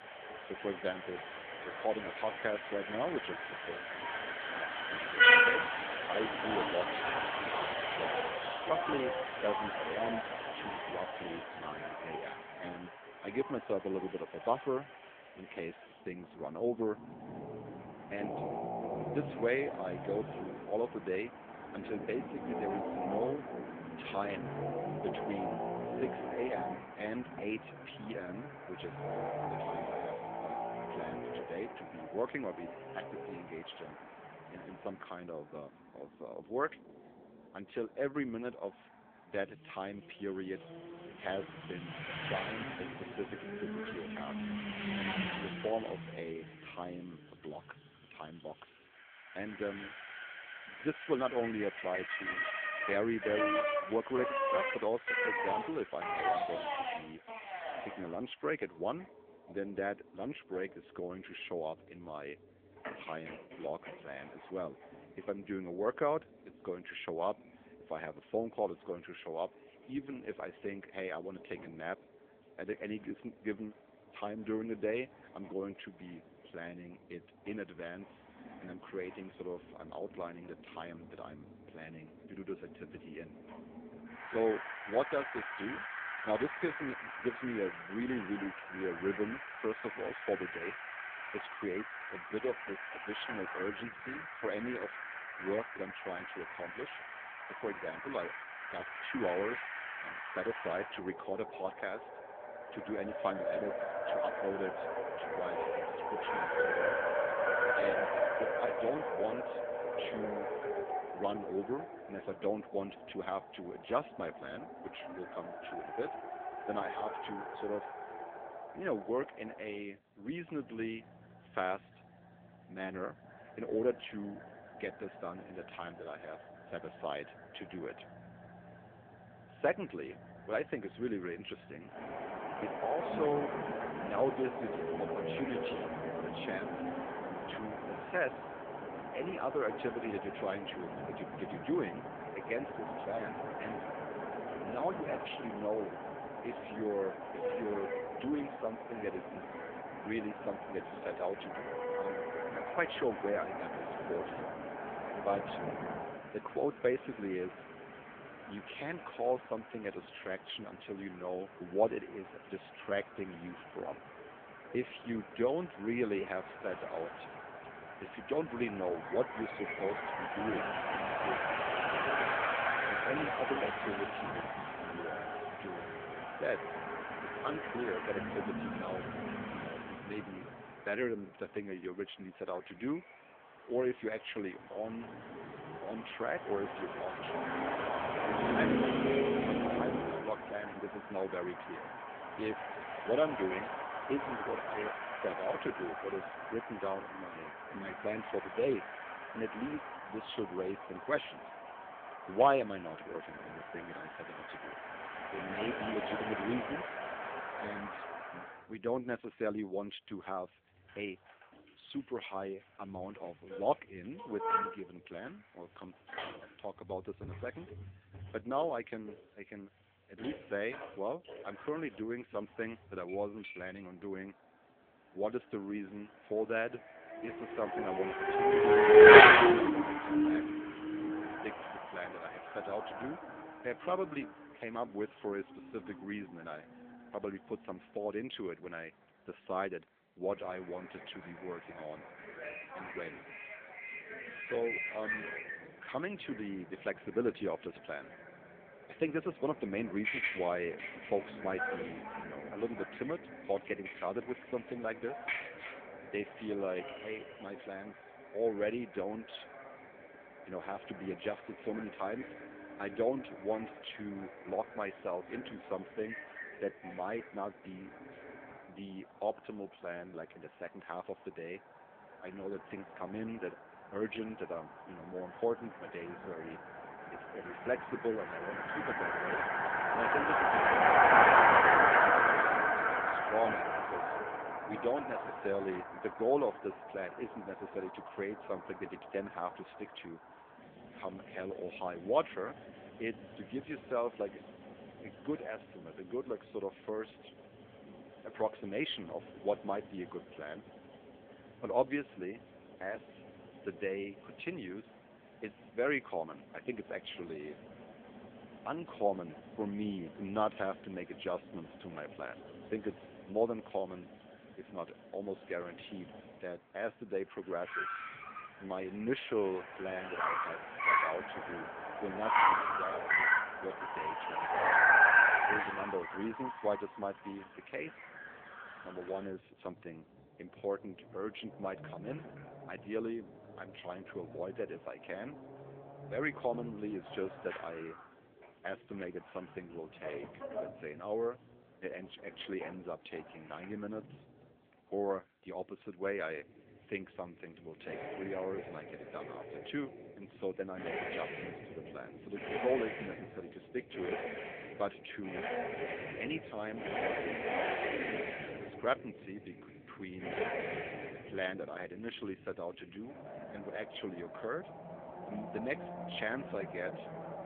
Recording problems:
phone-call audio; poor line; nothing above 3.5 kHz
traffic noise; very loud; throughout; 6 dB above the speech

